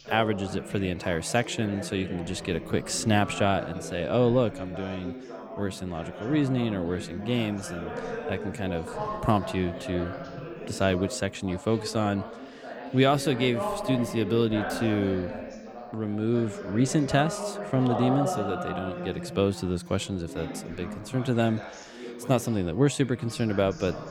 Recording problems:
background chatter; loud; throughout; 3 voices, 9 dB below the speech

